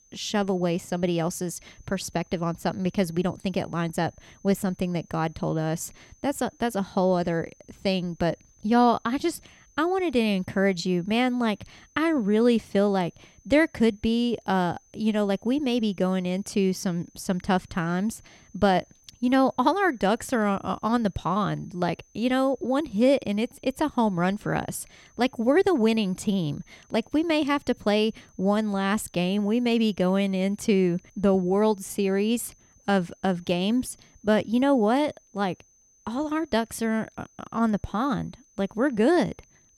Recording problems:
high-pitched whine; faint; throughout; 6 kHz, 35 dB below the speech

